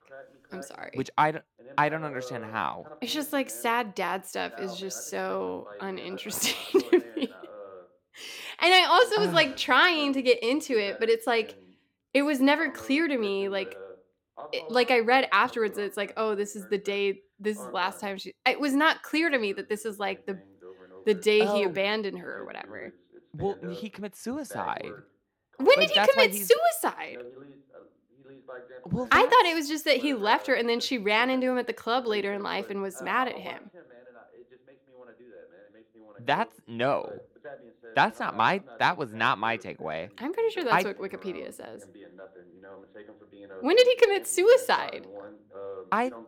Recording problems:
voice in the background; faint; throughout; 20 dB below the speech

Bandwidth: 17 kHz